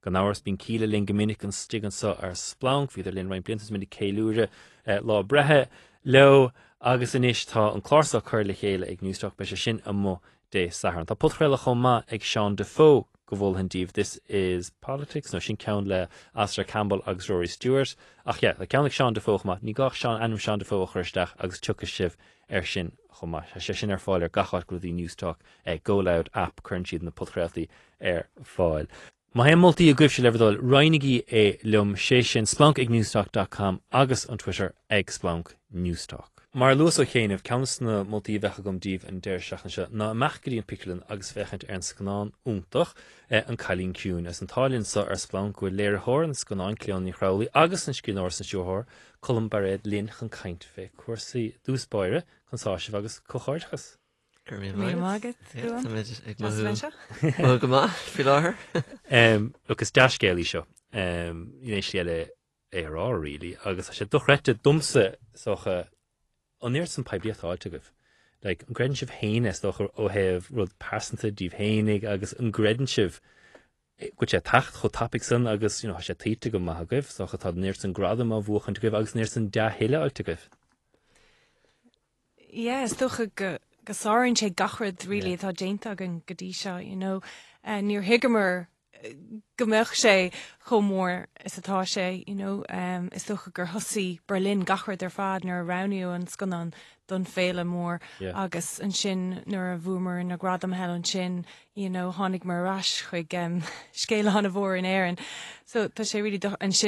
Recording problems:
garbled, watery; slightly; nothing above 11 kHz
abrupt cut into speech; at the end

